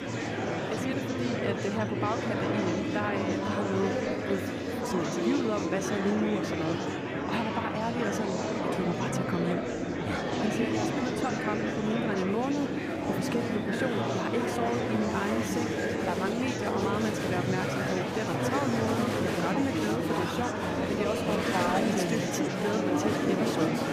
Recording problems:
murmuring crowd; very loud; throughout; 3 dB above the speech

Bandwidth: 15 kHz